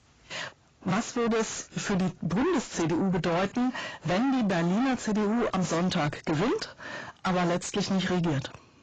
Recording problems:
distortion; heavy; 6 dB below the speech
garbled, watery; badly; nothing above 7.5 kHz

